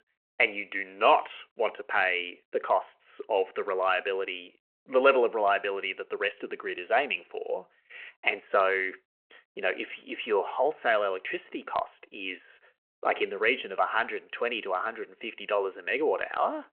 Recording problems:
phone-call audio

